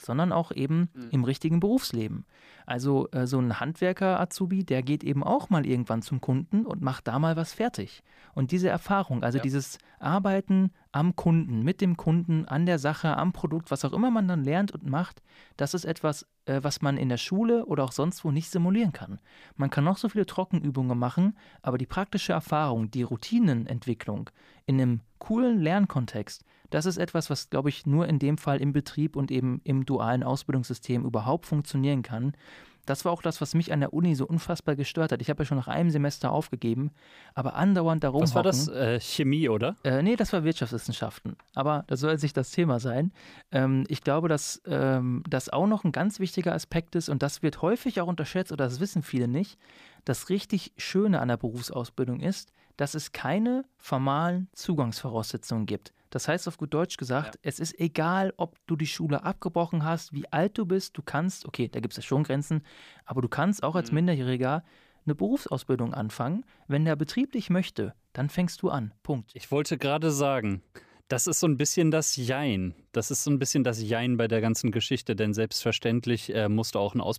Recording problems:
none

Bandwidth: 15 kHz